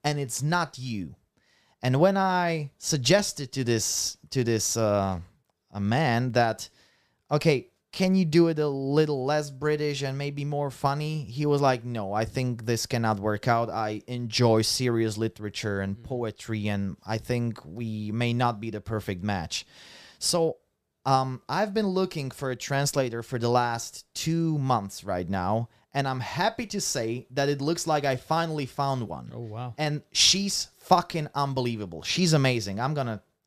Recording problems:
none

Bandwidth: 14.5 kHz